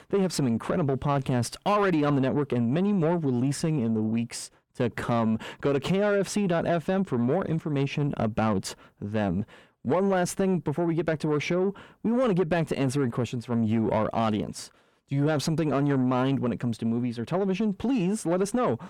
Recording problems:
distortion; slight; 10 dB below the speech

